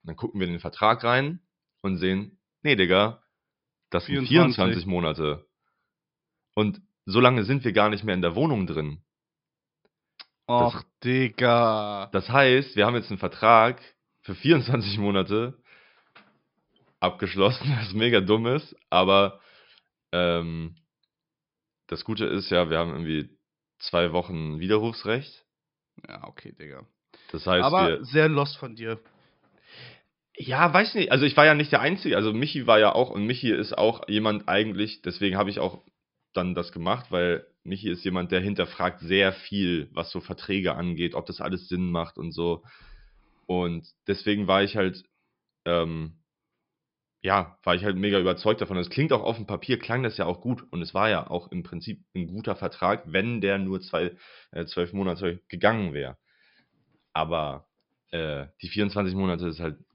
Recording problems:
high frequencies cut off; noticeable; nothing above 5.5 kHz

